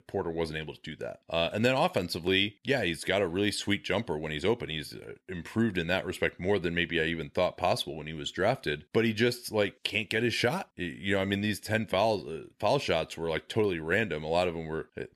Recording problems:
none

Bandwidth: 13.5 kHz